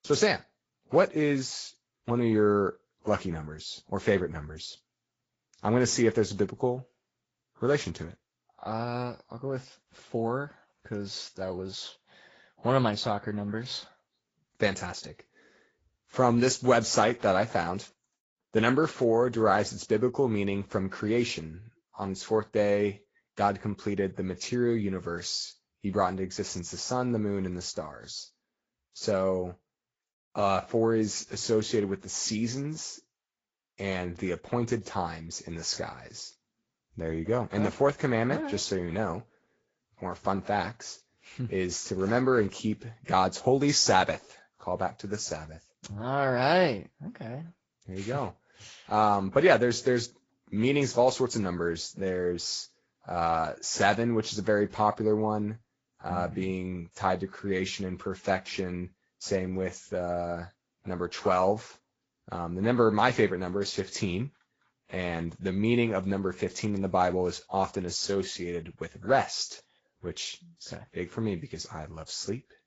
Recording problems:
high frequencies cut off; noticeable; nothing above 7.5 kHz
garbled, watery; slightly

